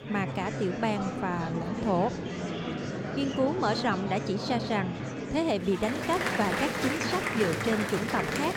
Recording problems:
murmuring crowd; loud; throughout; 2 dB below the speech

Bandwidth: 17 kHz